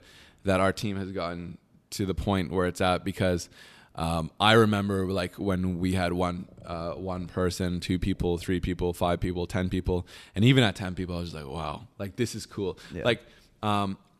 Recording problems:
none

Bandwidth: 14 kHz